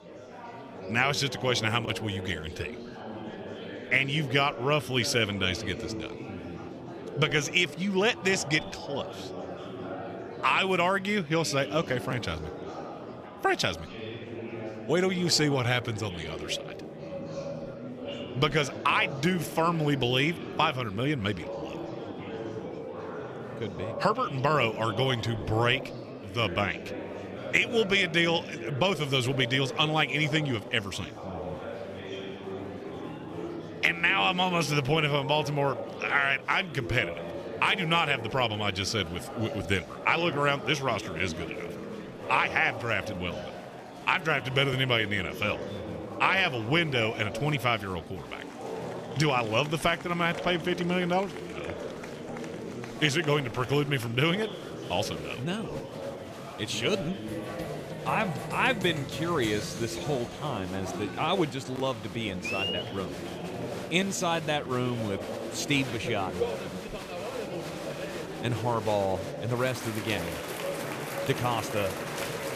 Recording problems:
murmuring crowd; loud; throughout; 10 dB below the speech

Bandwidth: 14.5 kHz